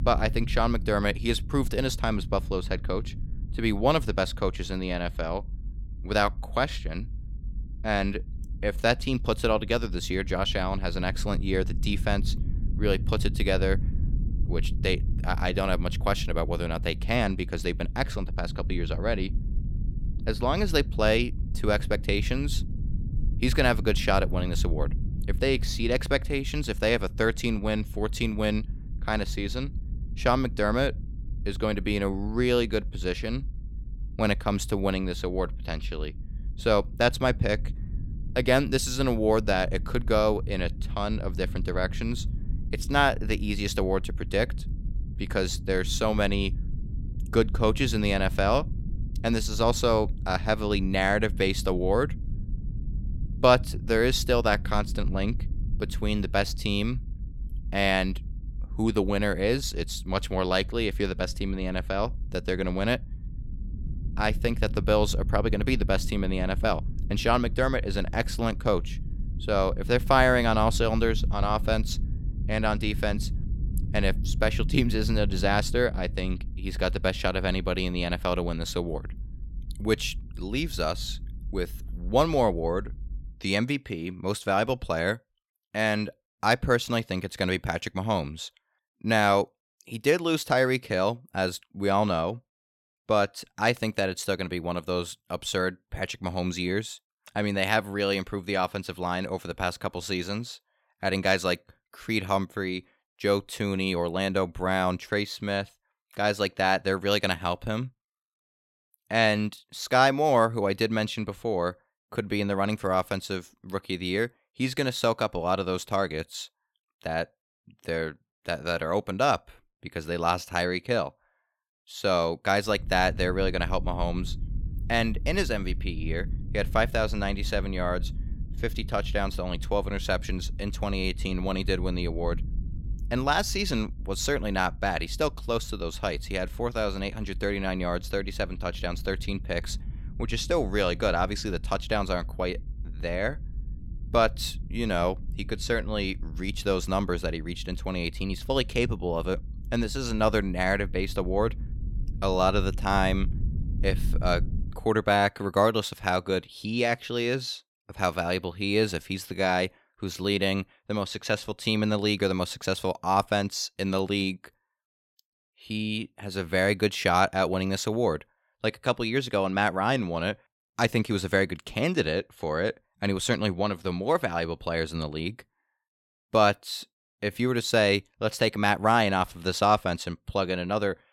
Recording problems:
low rumble; faint; until 1:23 and from 2:03 to 2:35; 20 dB below the speech

